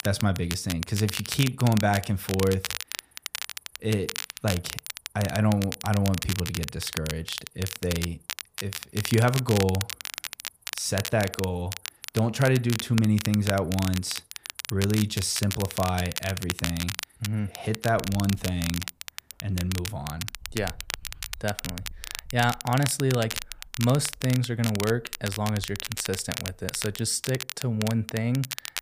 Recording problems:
crackle, like an old record; loud; 7 dB below the speech
animal sounds; faint; throughout; 30 dB below the speech

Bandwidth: 15 kHz